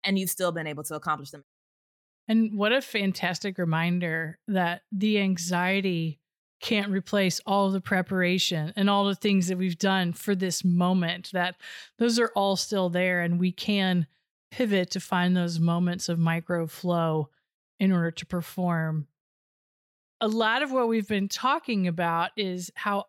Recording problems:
none

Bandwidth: 17 kHz